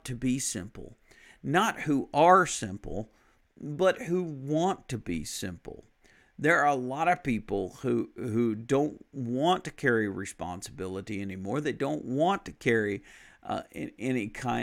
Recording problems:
abrupt cut into speech; at the end

